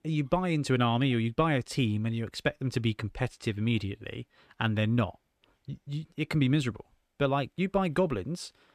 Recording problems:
none

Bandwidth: 14.5 kHz